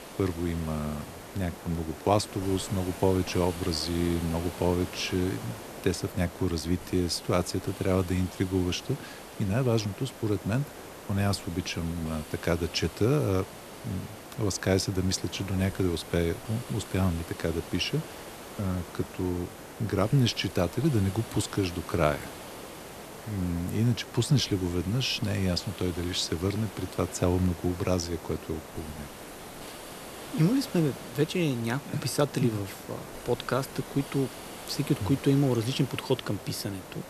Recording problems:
hiss; noticeable; throughout; 15 dB below the speech

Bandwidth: 14 kHz